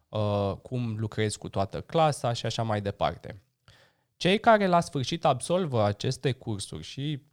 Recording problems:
none

